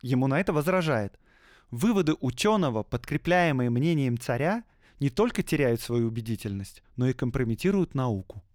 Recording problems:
none

